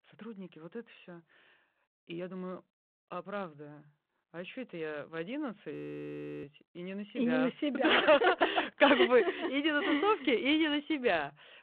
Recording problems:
phone-call audio
audio freezing; at 5.5 s for 0.5 s

